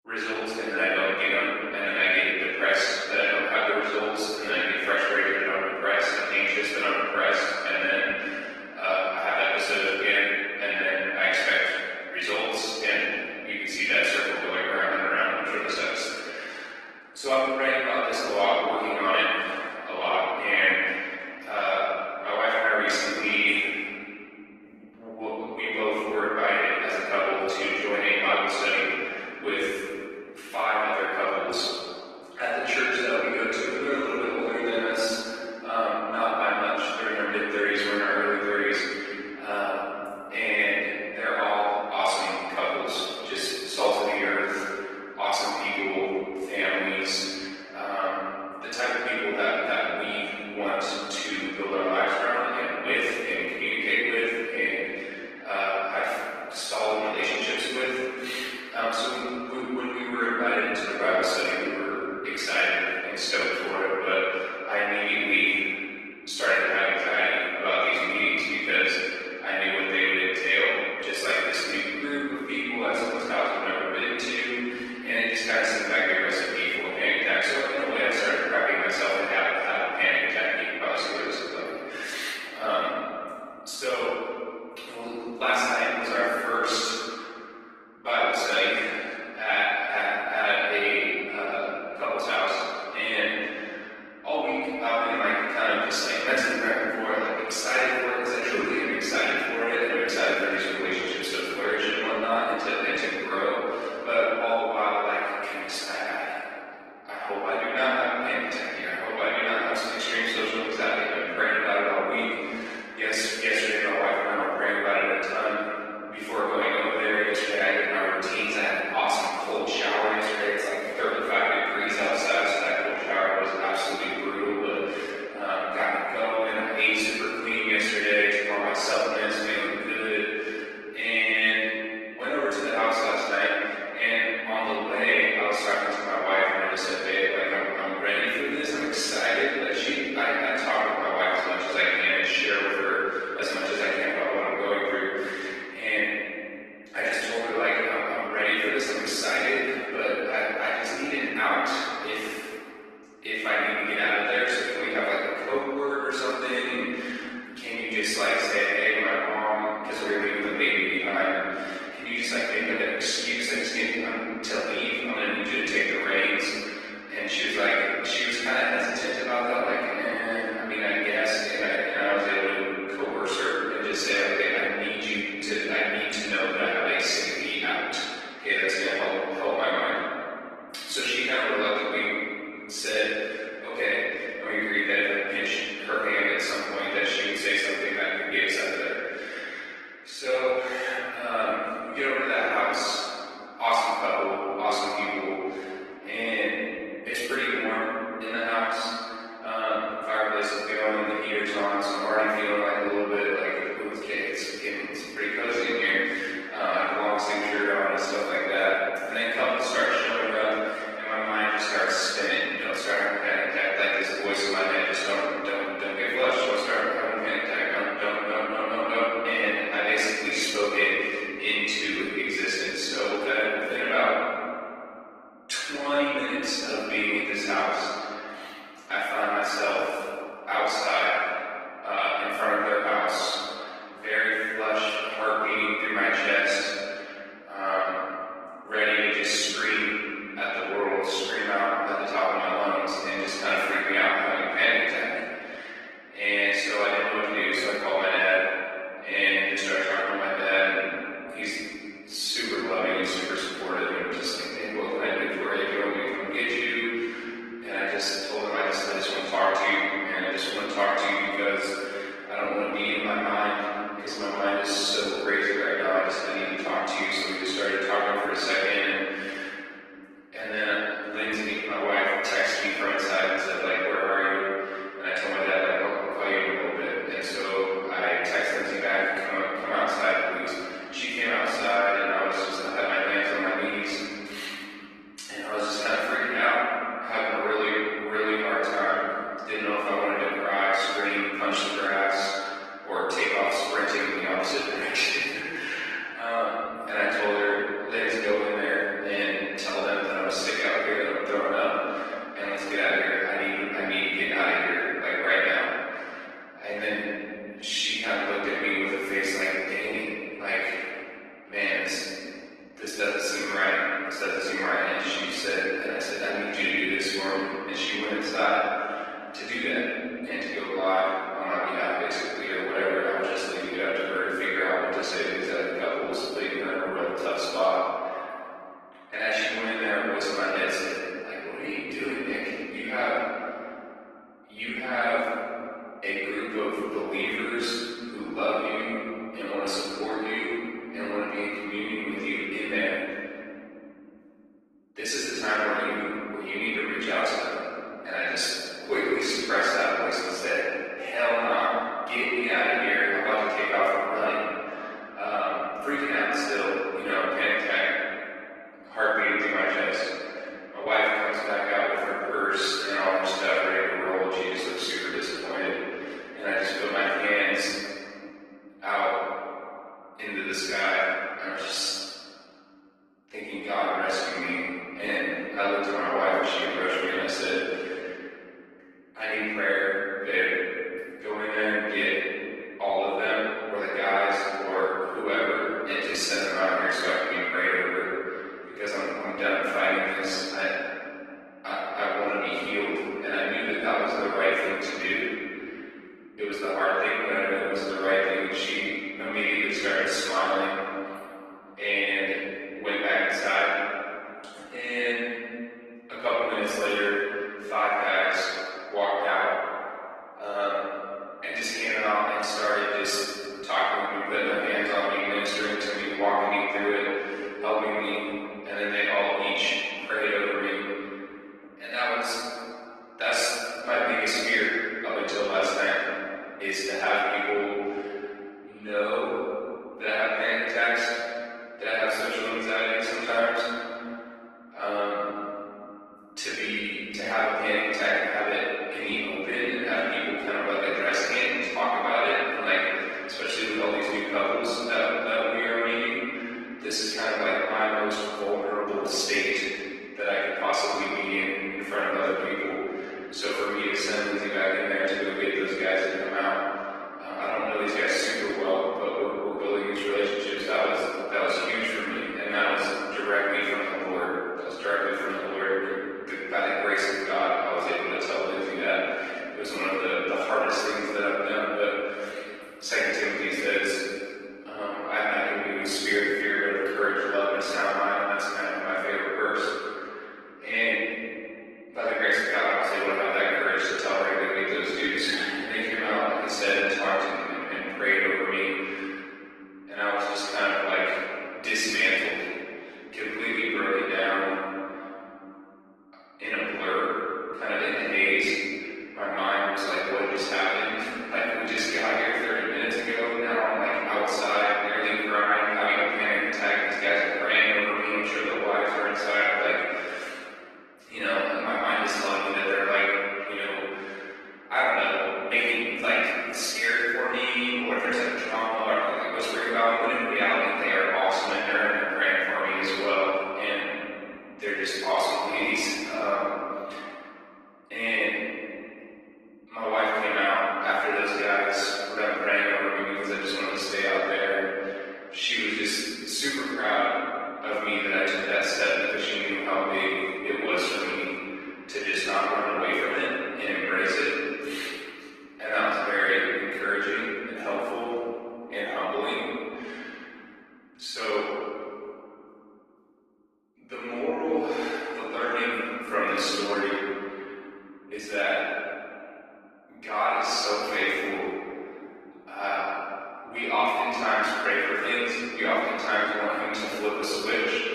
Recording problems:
room echo; strong; dies away in 2.6 s
off-mic speech; far
thin; somewhat; fading below 300 Hz
garbled, watery; slightly; nothing above 12 kHz

